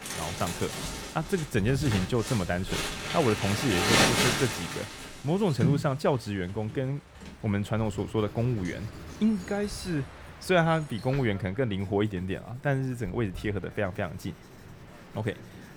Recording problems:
household noises; very loud; throughout; as loud as the speech
train or aircraft noise; faint; throughout; 20 dB below the speech

